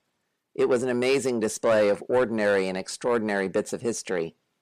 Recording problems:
distortion; slight; 10 dB below the speech

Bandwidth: 14.5 kHz